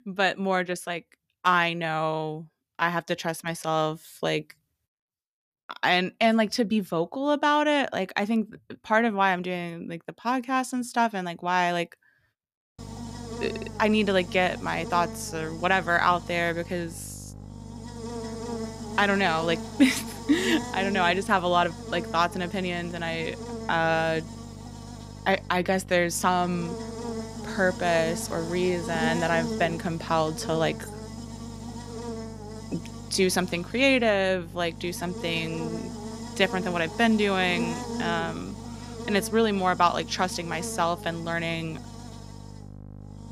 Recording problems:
electrical hum; noticeable; from 13 s on; 50 Hz, 15 dB below the speech

